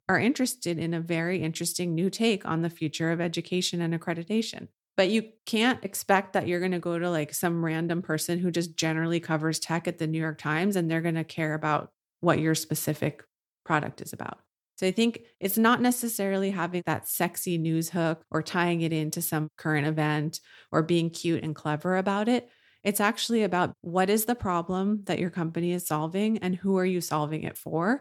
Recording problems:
none

